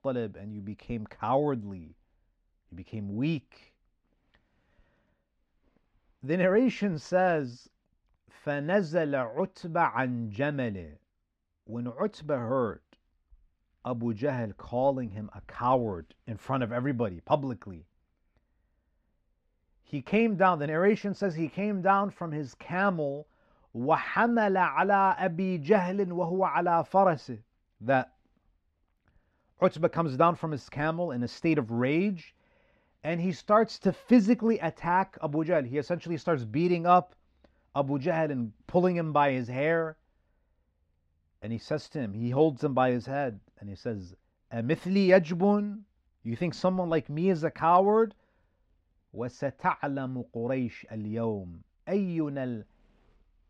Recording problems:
muffled; very slightly; fading above 3 kHz

